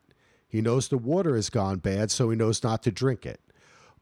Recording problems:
none

